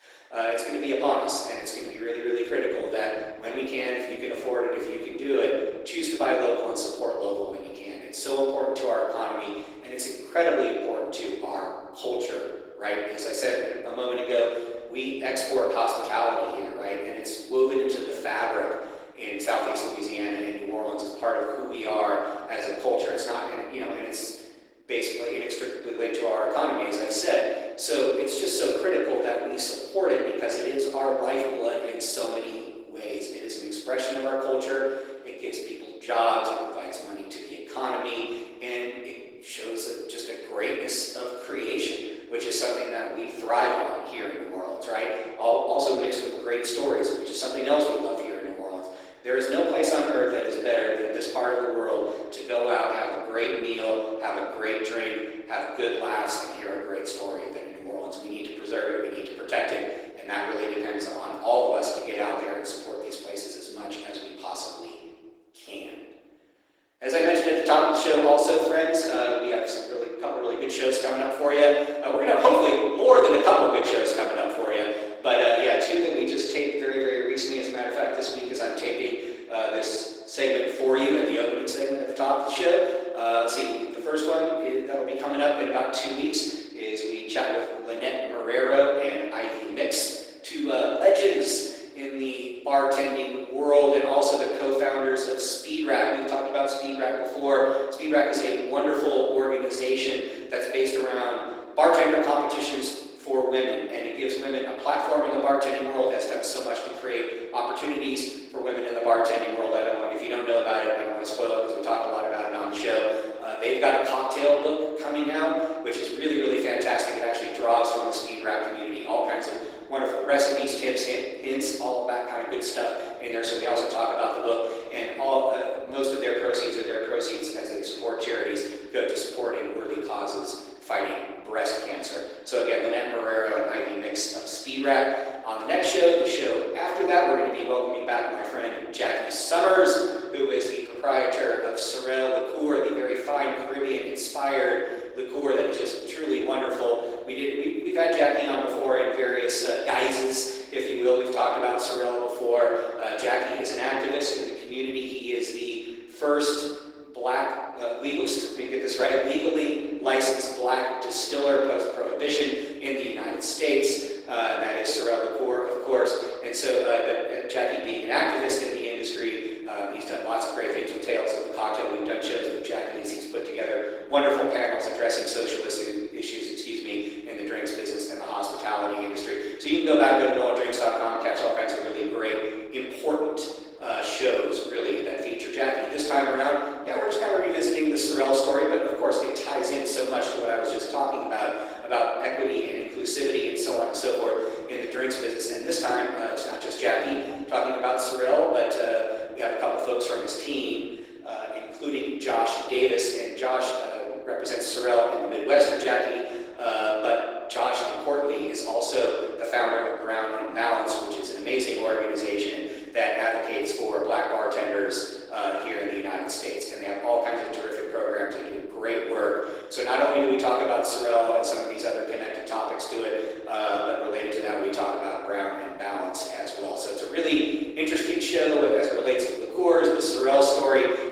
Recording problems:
off-mic speech; far
room echo; noticeable; dies away in 1.1 s
thin; somewhat; fading below 300 Hz
garbled, watery; slightly

